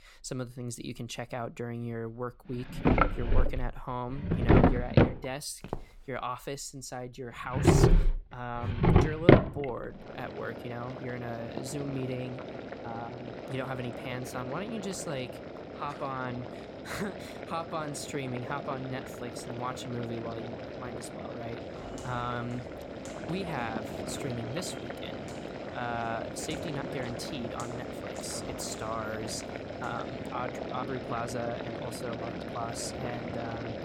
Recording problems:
household noises; very loud; throughout; 5 dB above the speech
footsteps; noticeable; at 5.5 s and from 22 to 30 s; peak 4 dB below the speech

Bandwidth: 17.5 kHz